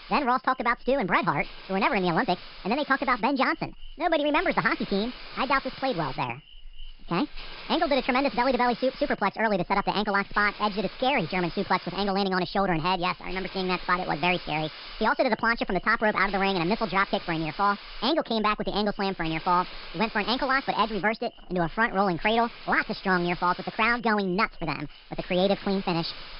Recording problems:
wrong speed and pitch; too fast and too high; 1.6 times normal speed
high frequencies cut off; noticeable; nothing above 5 kHz
hiss; noticeable; throughout; 15 dB below the speech

